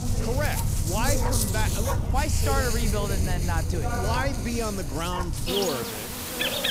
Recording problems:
animal sounds; very loud; throughout; 3 dB above the speech
chatter from many people; loud; throughout; 6 dB below the speech

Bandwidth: 15.5 kHz